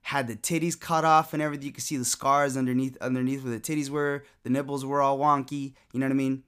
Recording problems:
none

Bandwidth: 15 kHz